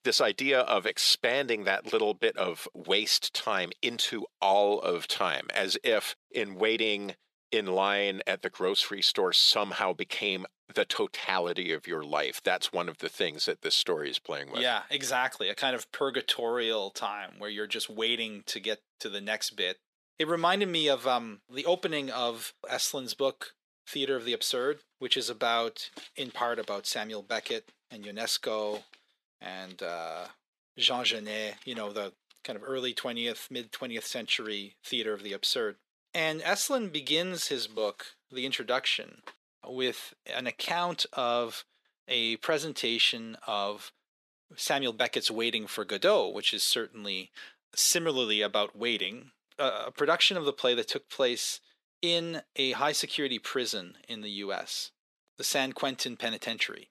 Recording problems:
thin; somewhat; fading below 450 Hz

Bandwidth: 13.5 kHz